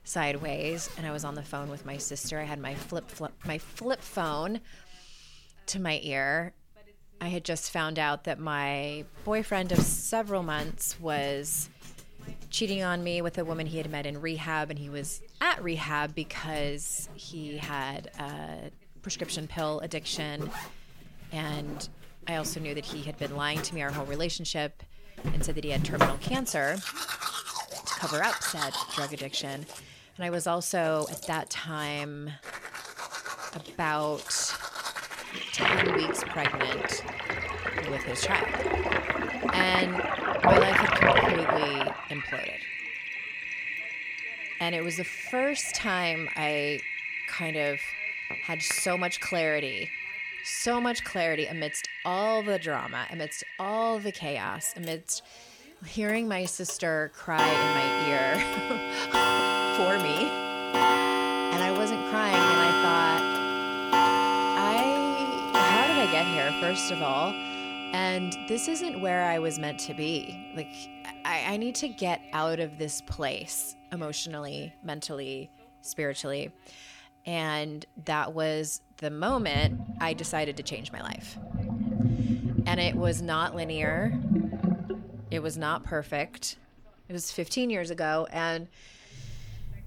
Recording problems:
household noises; very loud; throughout; 2 dB above the speech
voice in the background; faint; throughout; 30 dB below the speech

